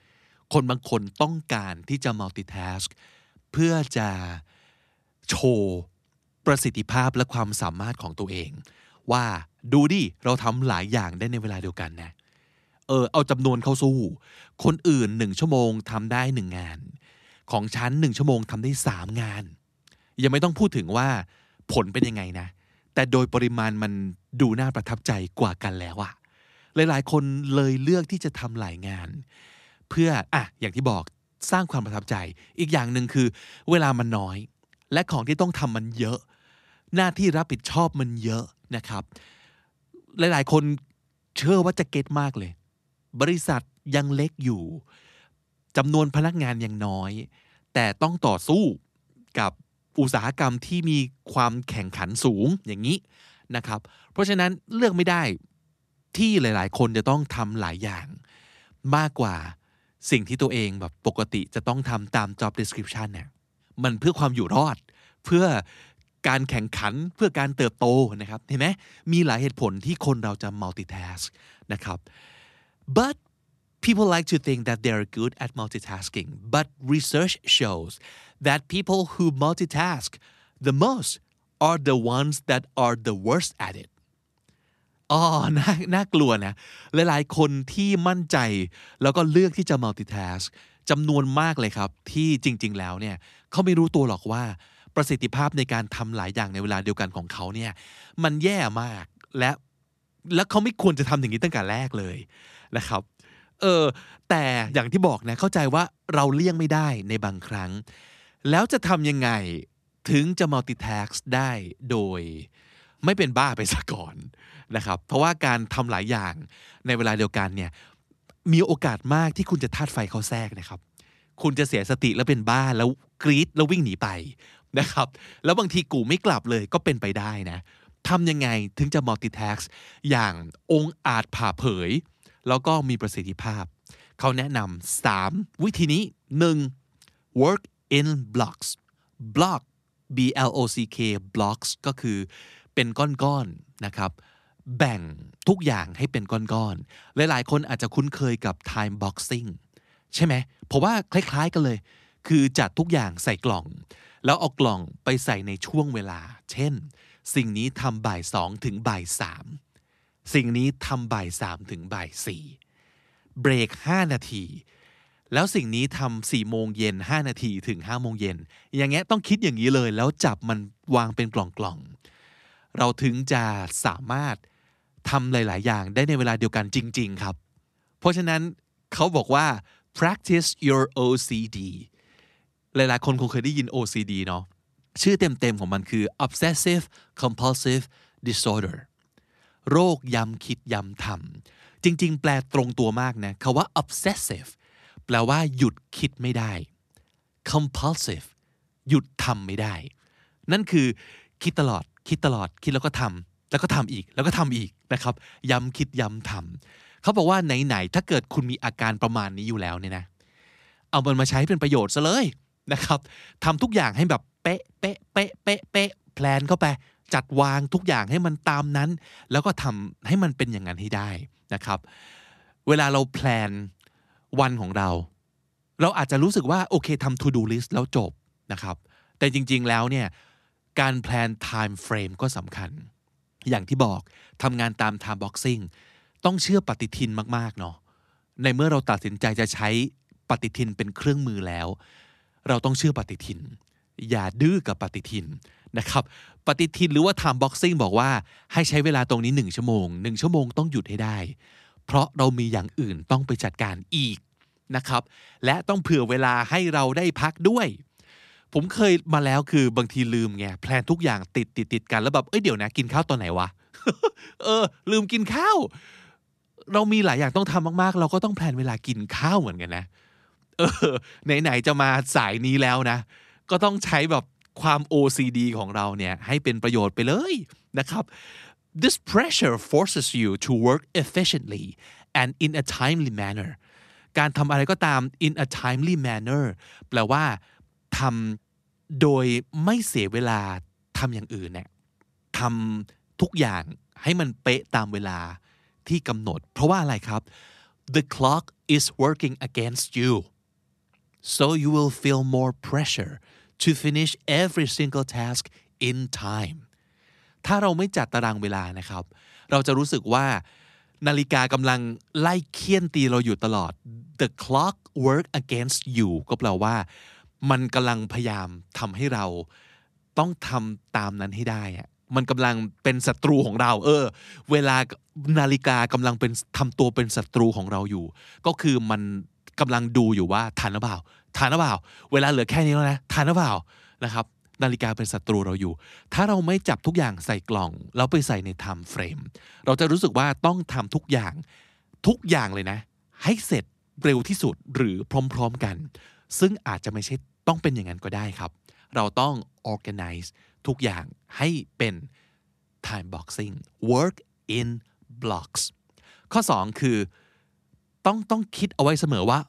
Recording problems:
none

